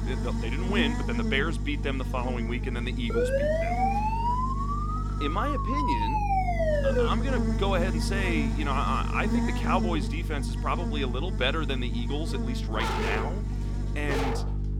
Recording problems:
electrical hum; loud; throughout; 50 Hz, 8 dB below the speech
siren; loud; from 3 to 7 s; peak 6 dB above the speech
dog barking; loud; from 13 s on; peak 2 dB above the speech

